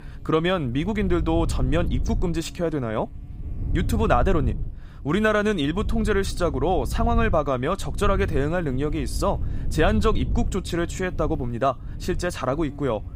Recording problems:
wind noise on the microphone; occasional gusts; 20 dB below the speech
electrical hum; faint; throughout; 60 Hz, 30 dB below the speech

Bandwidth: 15.5 kHz